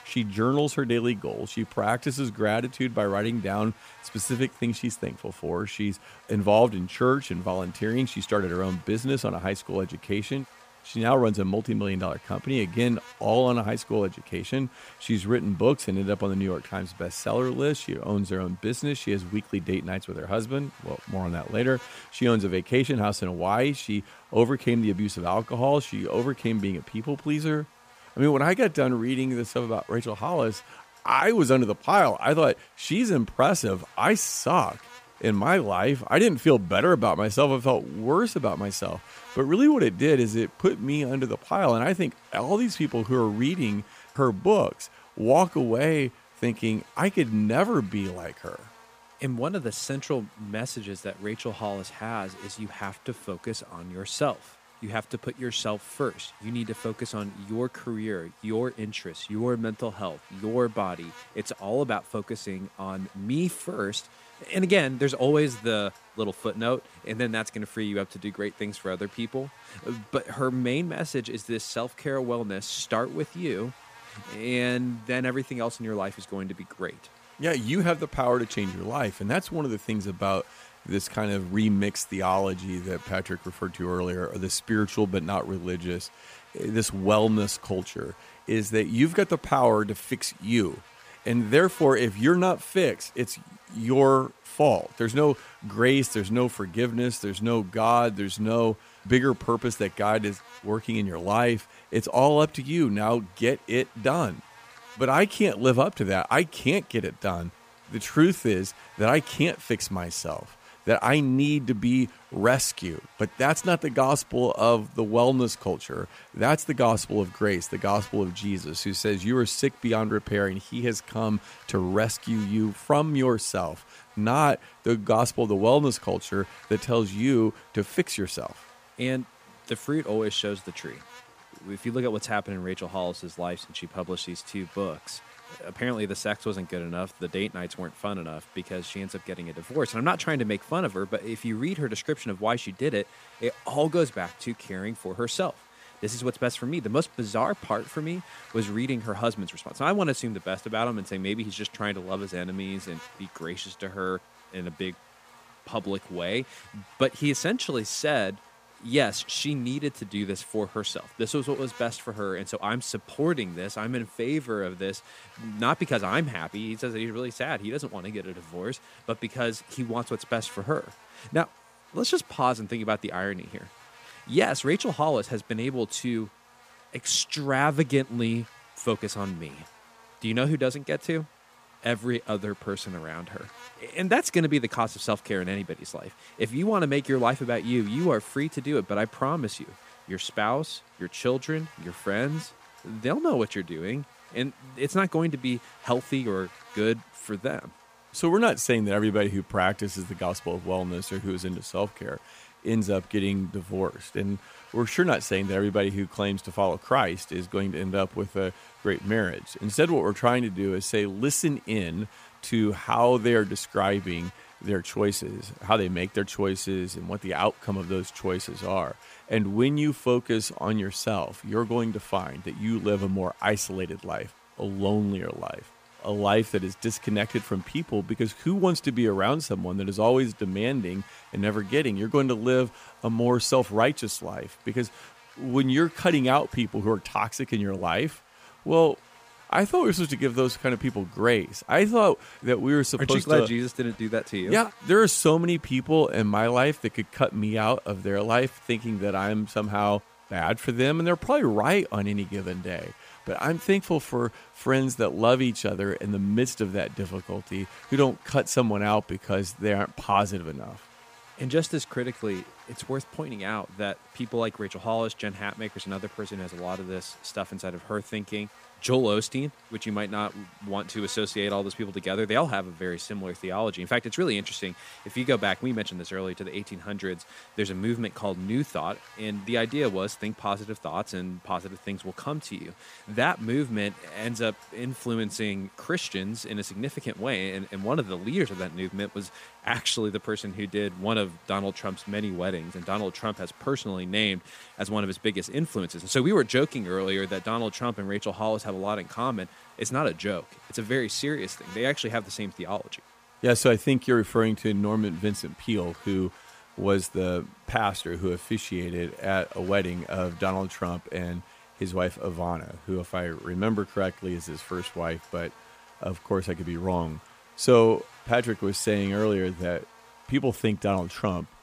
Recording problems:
electrical hum; faint; throughout; 60 Hz, 20 dB below the speech

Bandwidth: 15 kHz